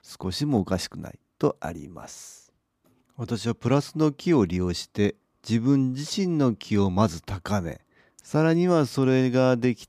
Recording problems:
none

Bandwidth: 15 kHz